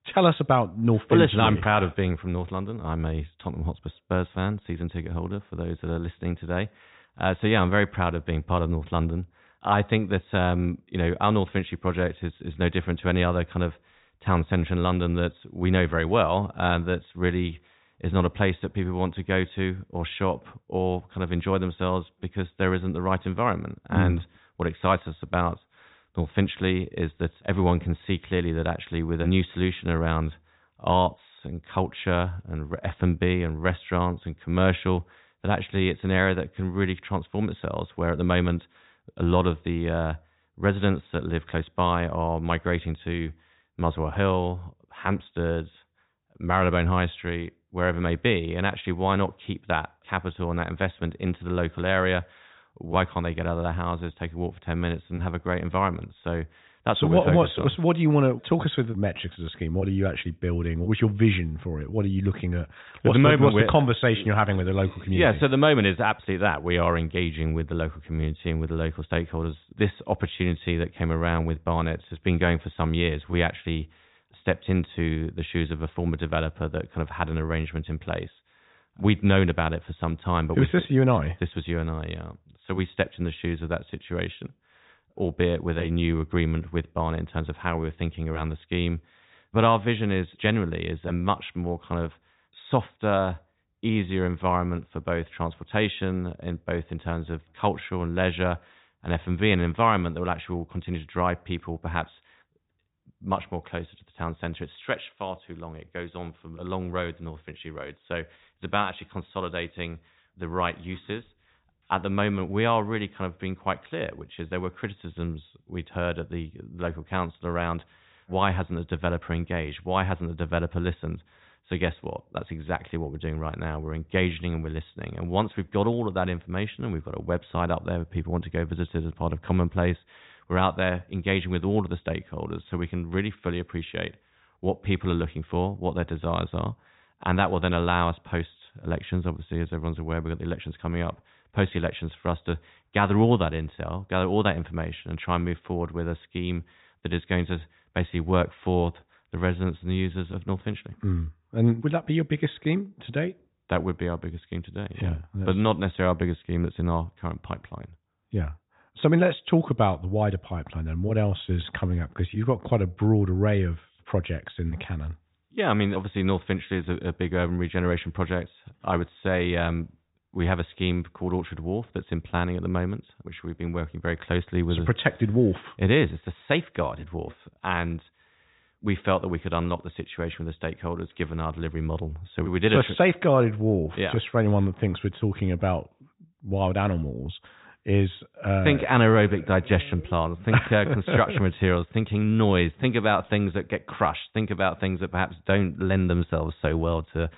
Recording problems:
high frequencies cut off; severe; nothing above 4 kHz

